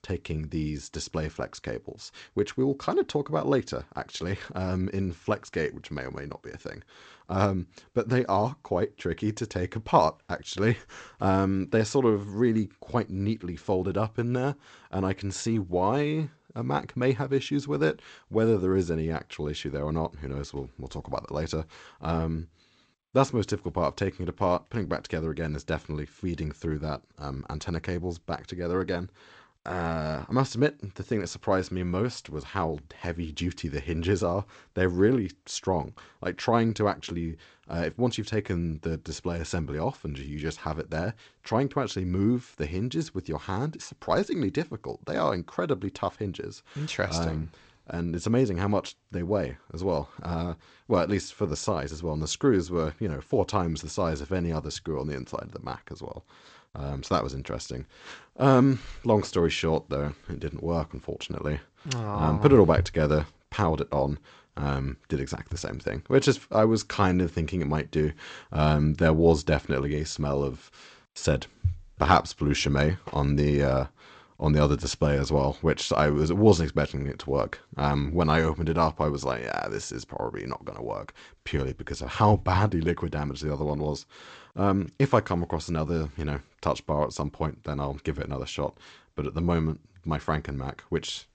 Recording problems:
garbled, watery; slightly; nothing above 8 kHz

